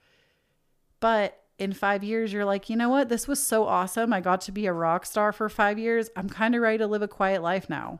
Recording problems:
none

